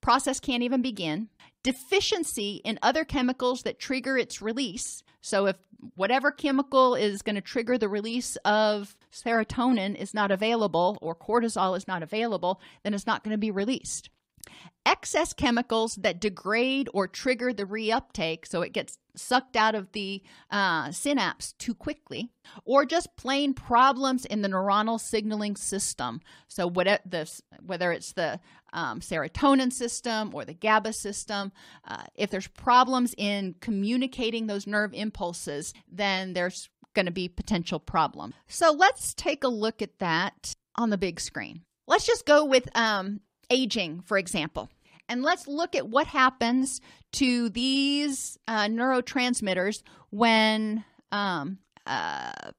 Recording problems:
none

